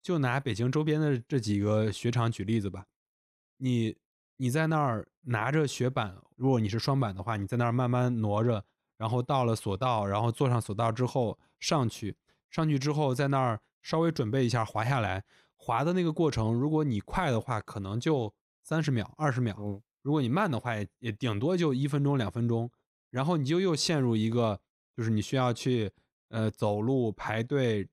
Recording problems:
none

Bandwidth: 15.5 kHz